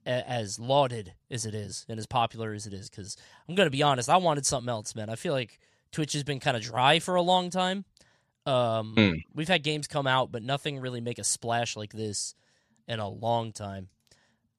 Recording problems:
none

